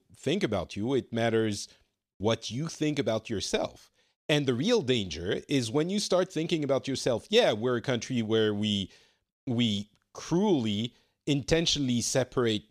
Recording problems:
none

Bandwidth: 14.5 kHz